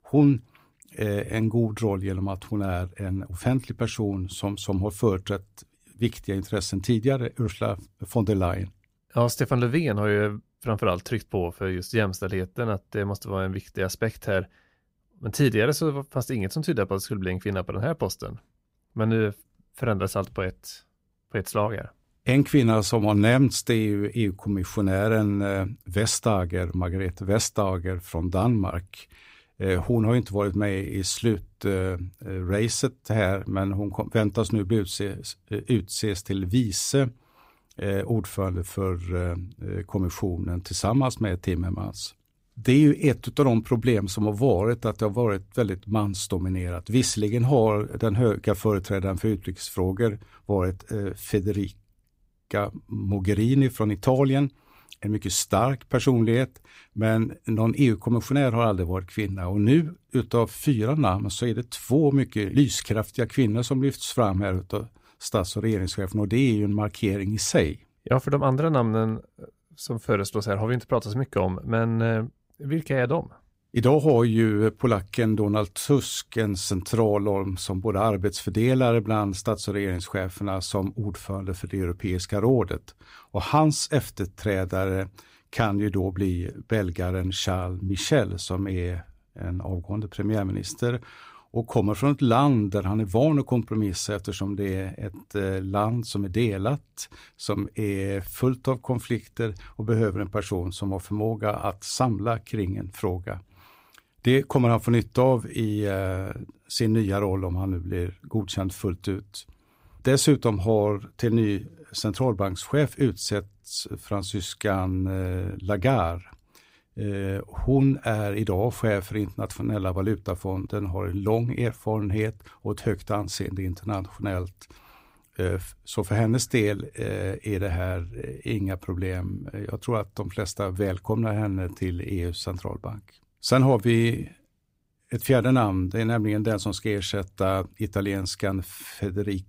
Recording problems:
none

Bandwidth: 15.5 kHz